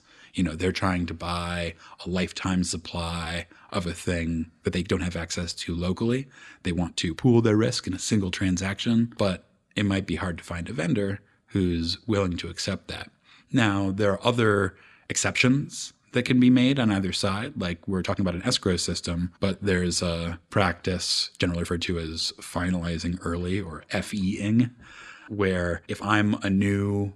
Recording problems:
uneven, jittery; strongly; from 1 to 26 s

